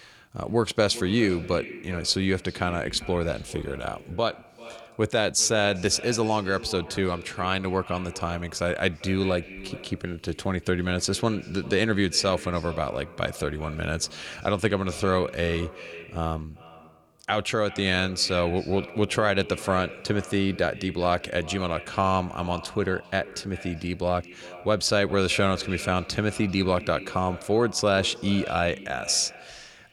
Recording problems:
echo of what is said; noticeable; throughout; 390 ms later, 15 dB below the speech

